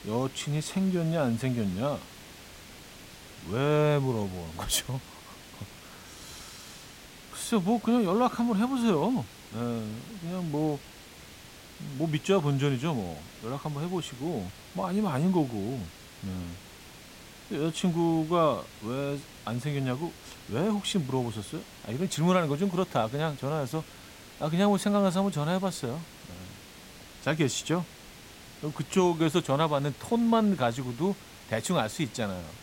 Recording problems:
hiss; noticeable; throughout; 20 dB below the speech

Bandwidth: 16 kHz